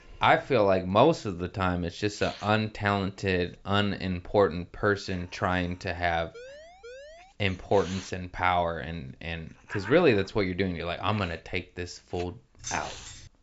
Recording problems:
high frequencies cut off; noticeable; nothing above 8 kHz
hiss; noticeable; throughout; 20 dB below the speech
siren; faint; at 6.5 s; peak 20 dB below the speech
jangling keys; noticeable; at 13 s; peak 10 dB below the speech

